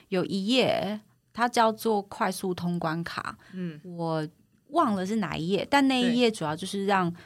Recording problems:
none

